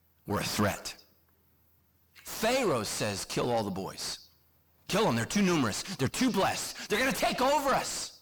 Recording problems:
distortion; heavy; 5 dB below the speech

